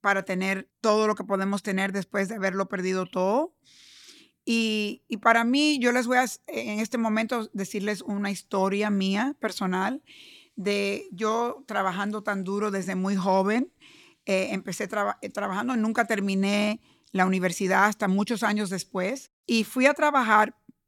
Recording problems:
none

